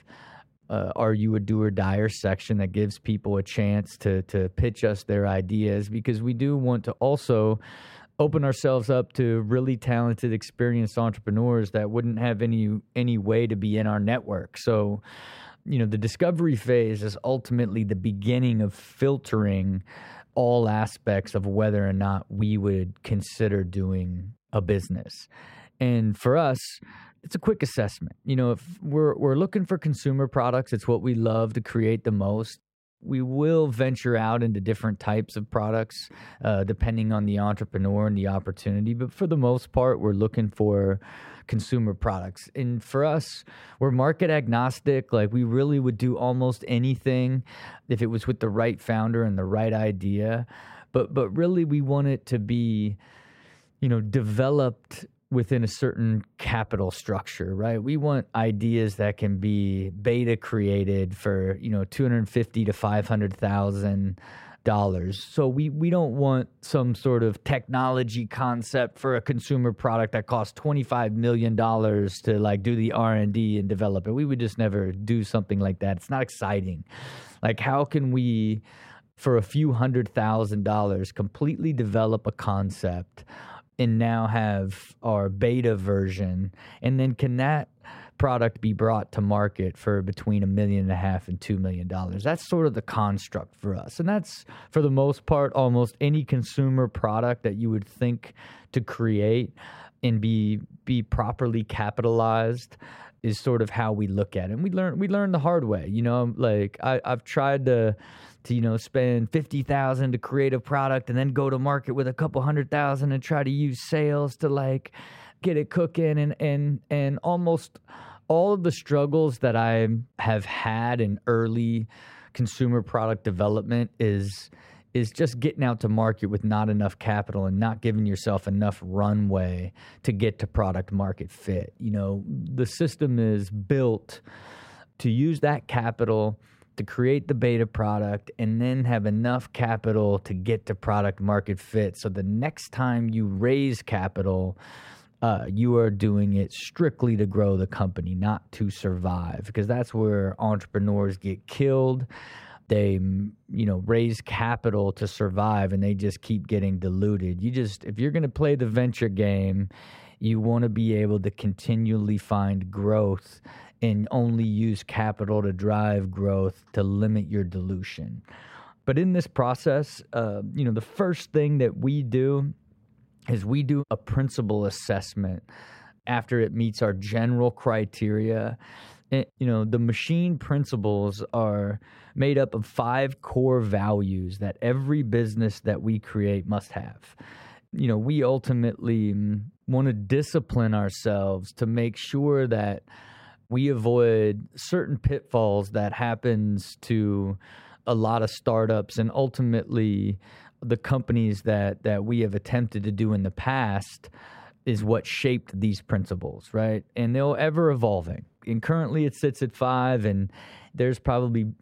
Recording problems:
muffled; slightly; fading above 3 kHz

